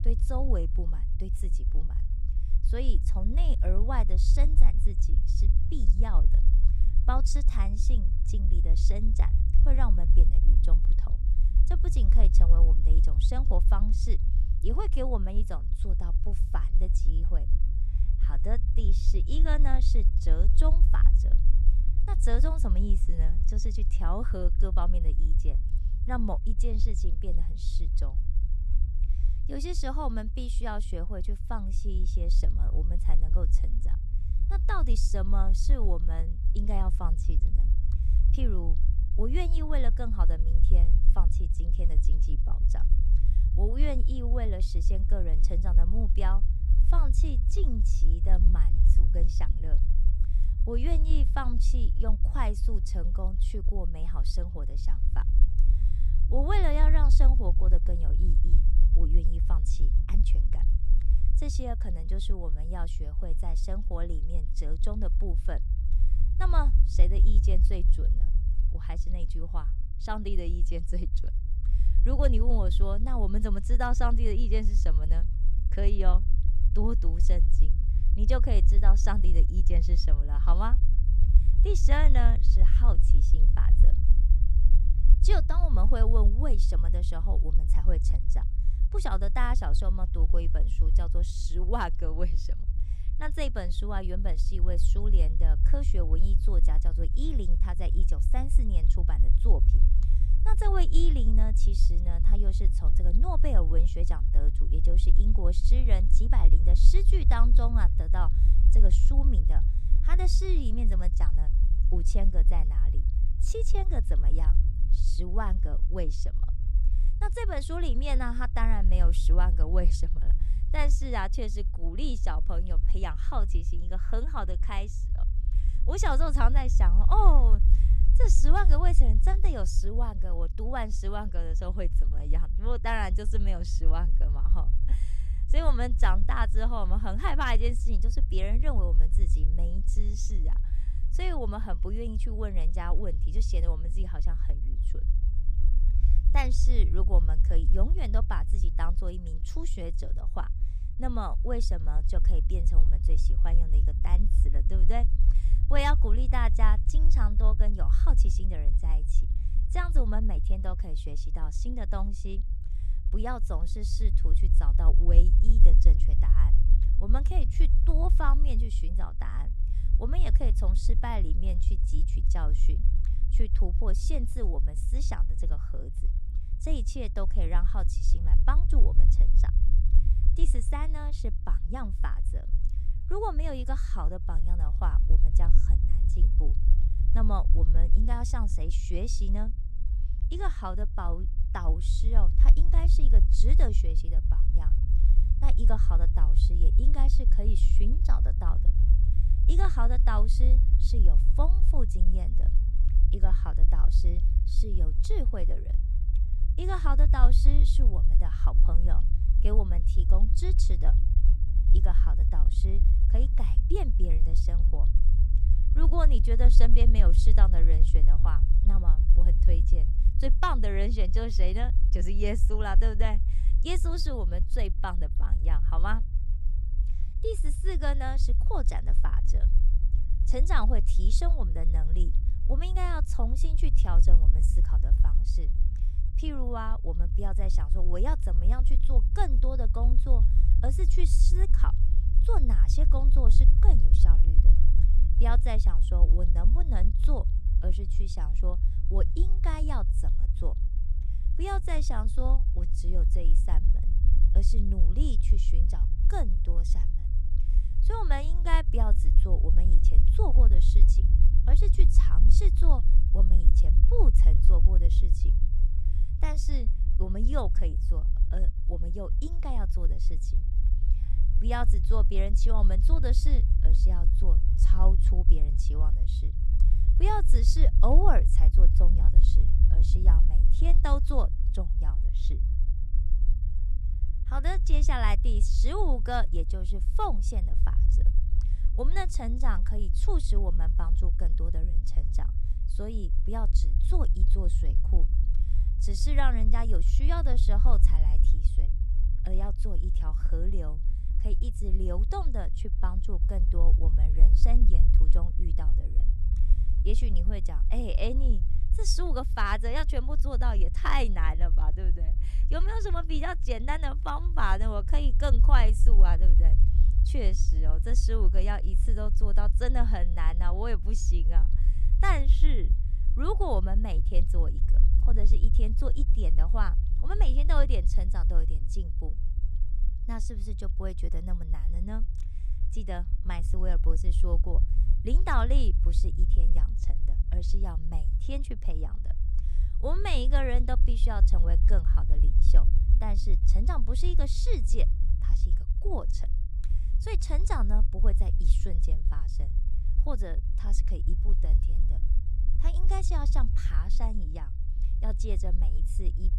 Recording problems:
low rumble; noticeable; throughout; 10 dB below the speech

